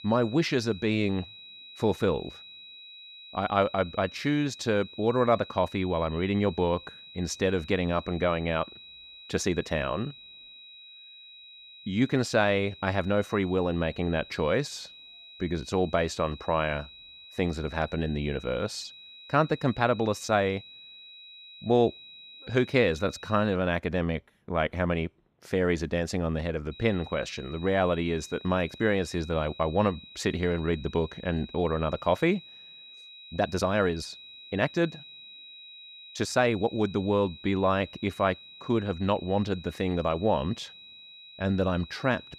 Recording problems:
high-pitched whine; noticeable; until 24 s and from 27 s on; 4 kHz, 15 dB below the speech
uneven, jittery; strongly; from 5.5 to 42 s

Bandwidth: 15 kHz